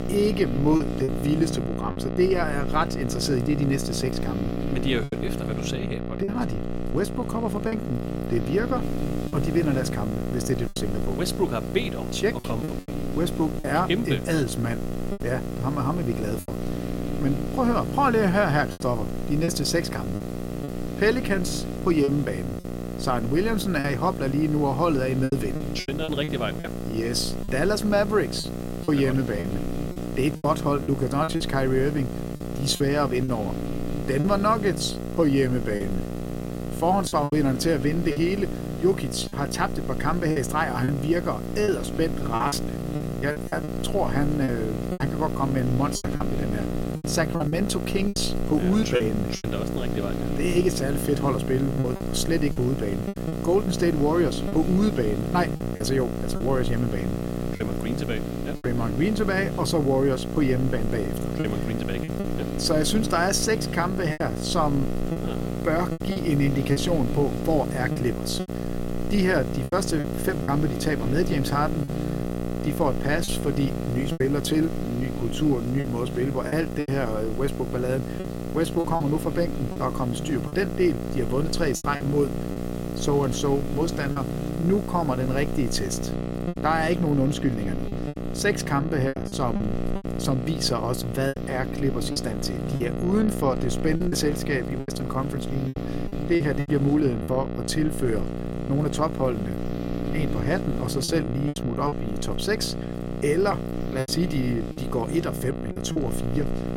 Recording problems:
electrical hum; loud; throughout; 60 Hz, 7 dB below the speech
hiss; faint; from 9 s to 1:26; 20 dB below the speech
choppy; very; 6% of the speech affected

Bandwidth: 16 kHz